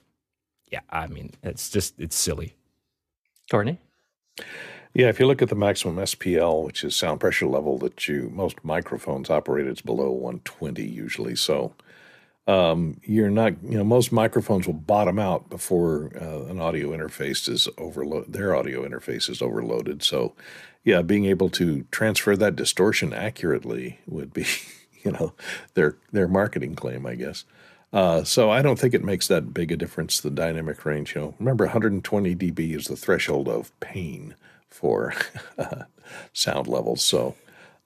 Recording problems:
none

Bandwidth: 14.5 kHz